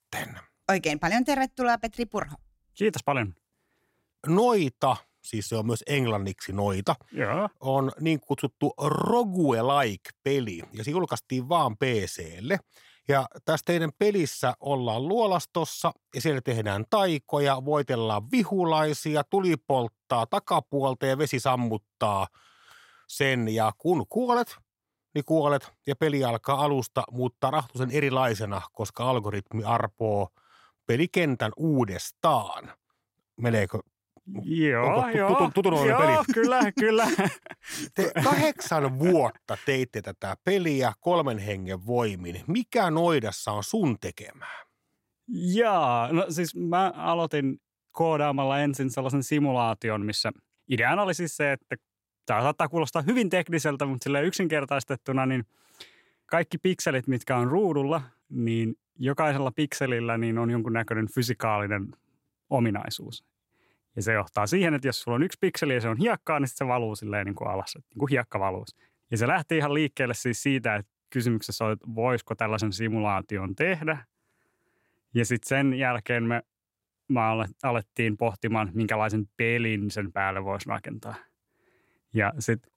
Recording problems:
none

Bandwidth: 16 kHz